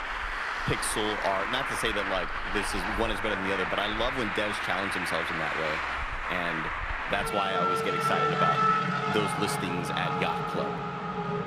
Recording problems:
traffic noise; very loud; throughout; 3 dB above the speech

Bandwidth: 15 kHz